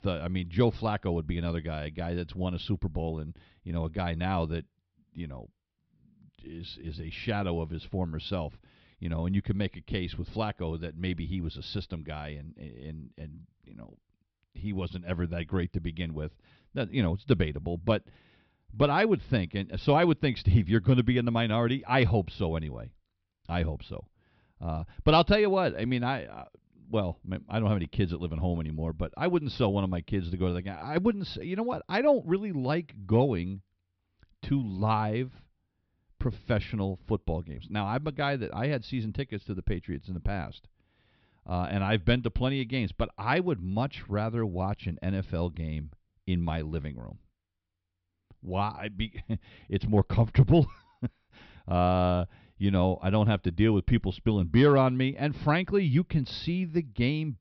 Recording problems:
high frequencies cut off; noticeable; nothing above 5.5 kHz

